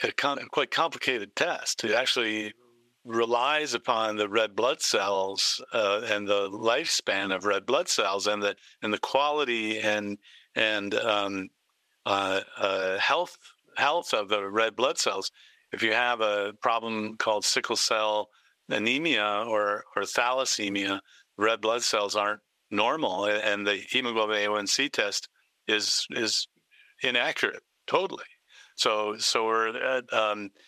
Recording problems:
thin; somewhat; fading below 550 Hz
squashed, flat; somewhat

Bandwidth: 15 kHz